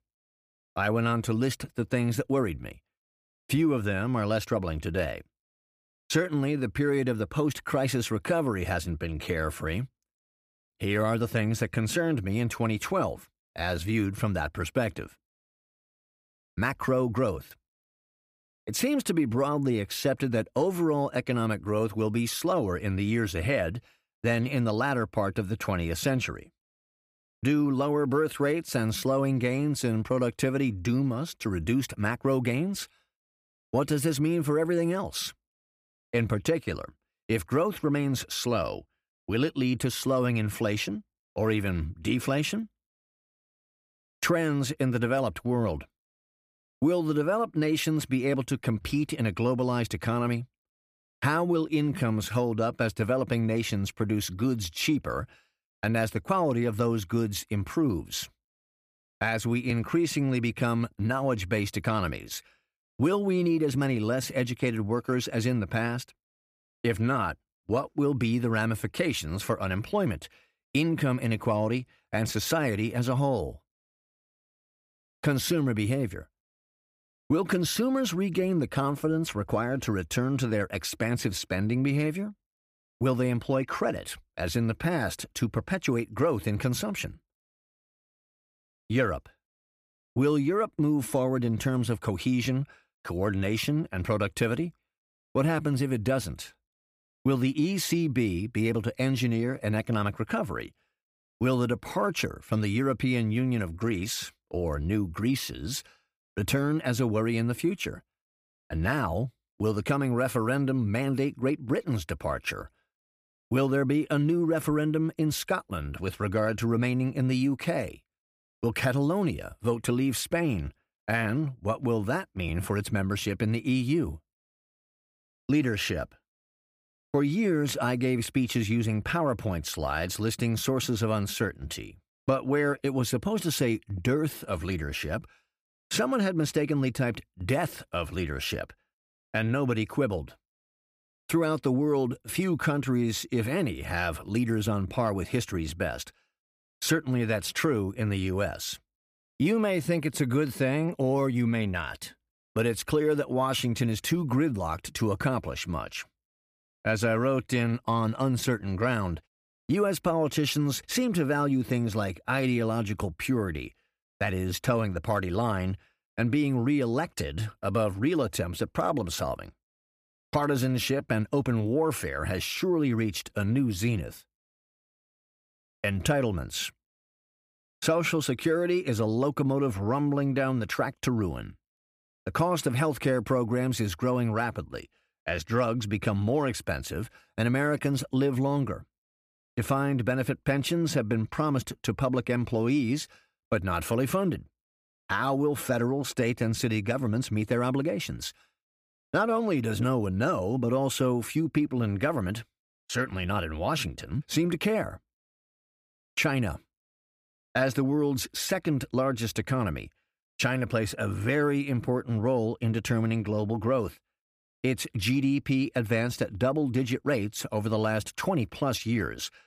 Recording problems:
none

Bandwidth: 15 kHz